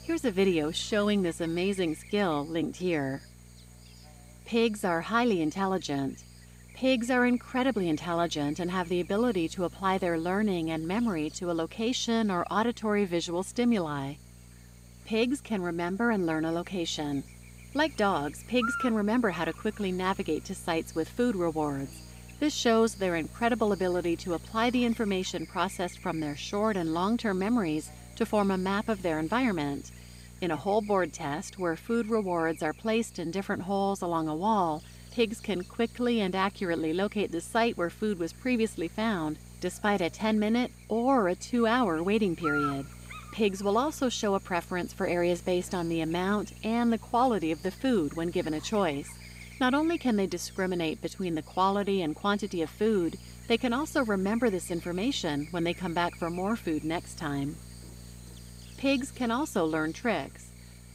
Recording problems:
electrical hum; noticeable; throughout; 60 Hz, 15 dB below the speech

